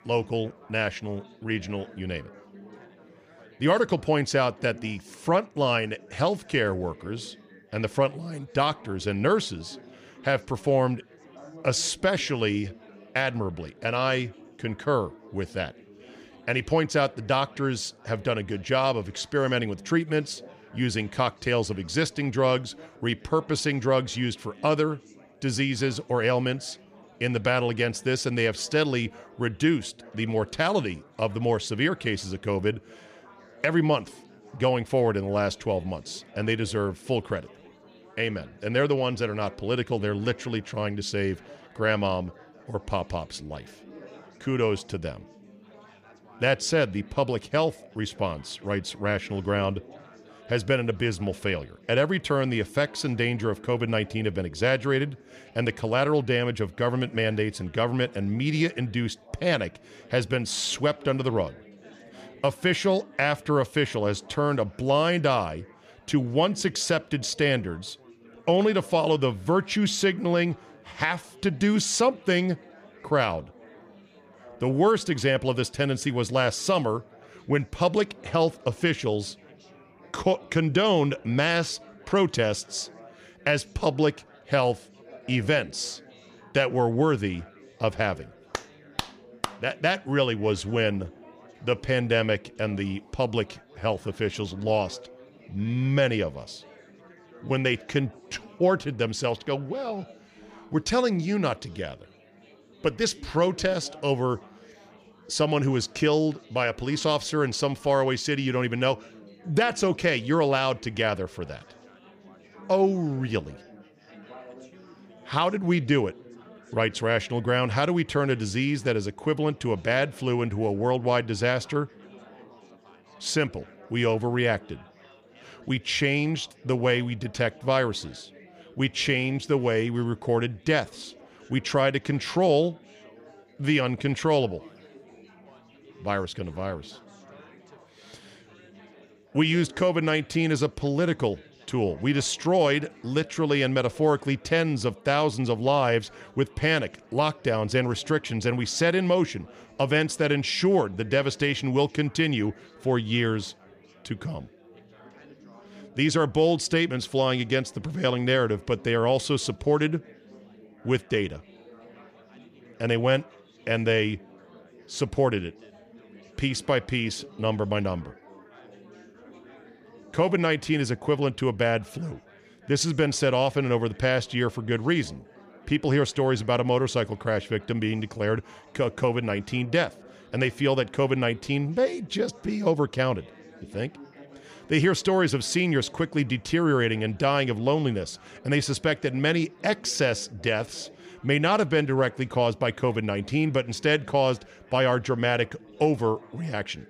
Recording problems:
chatter from many people; faint; throughout; 25 dB below the speech

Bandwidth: 15 kHz